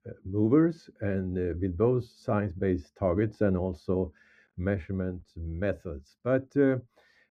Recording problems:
muffled; very; fading above 2.5 kHz

